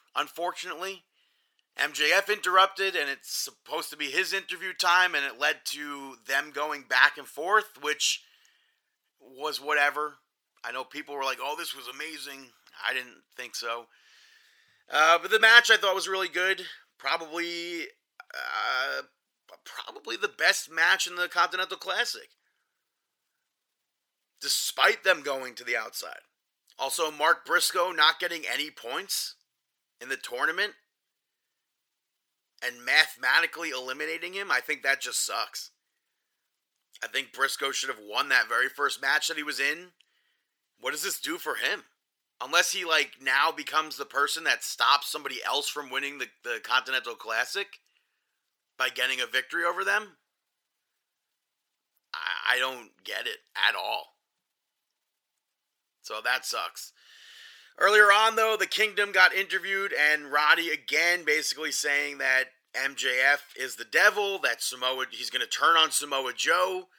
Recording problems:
thin; very; fading below 850 Hz

